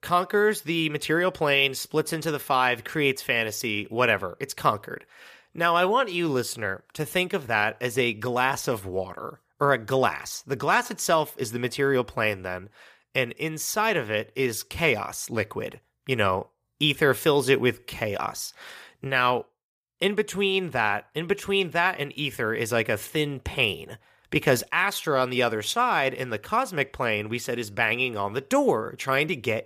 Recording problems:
none

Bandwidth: 15 kHz